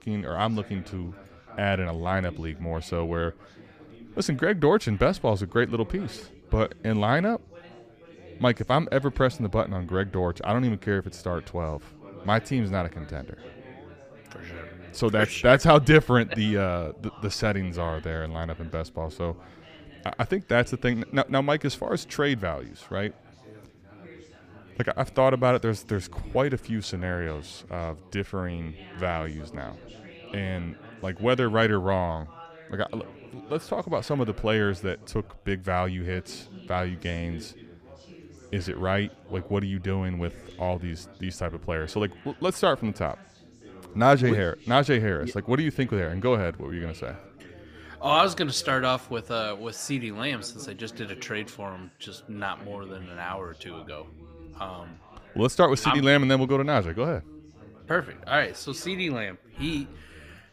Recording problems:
background chatter; faint; throughout; 4 voices, 20 dB below the speech

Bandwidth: 15 kHz